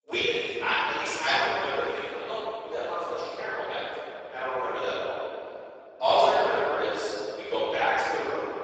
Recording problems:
room echo; strong; dies away in 3 s
off-mic speech; far
garbled, watery; badly; nothing above 7.5 kHz
thin; very; fading below 400 Hz

